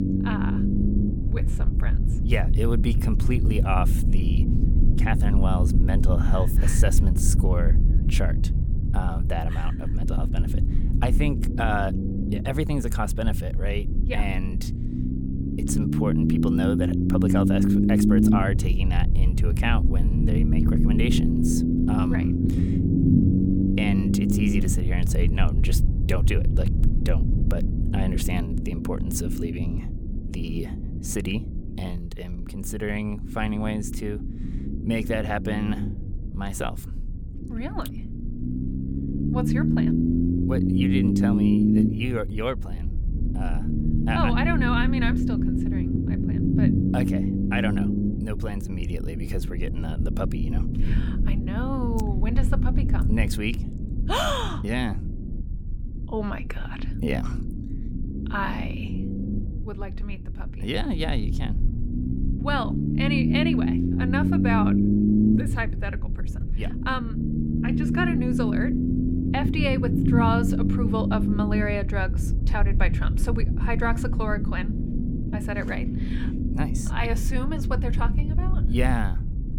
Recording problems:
low rumble; loud; throughout; 1 dB below the speech

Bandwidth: 18 kHz